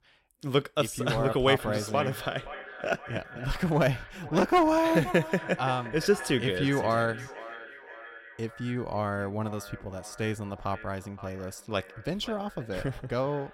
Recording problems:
echo of what is said; noticeable; throughout; 520 ms later, 15 dB below the speech

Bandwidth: 16 kHz